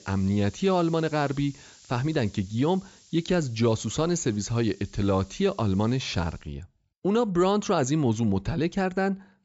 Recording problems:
high frequencies cut off; noticeable; nothing above 8 kHz
hiss; faint; until 6.5 s; 25 dB below the speech

